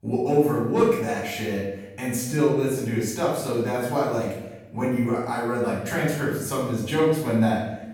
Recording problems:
off-mic speech; far
room echo; noticeable; dies away in 0.9 s

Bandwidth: 17 kHz